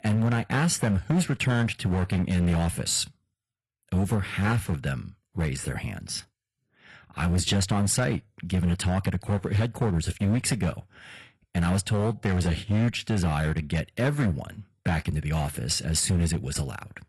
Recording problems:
distortion; slight; 8% of the sound clipped
garbled, watery; slightly; nothing above 11.5 kHz

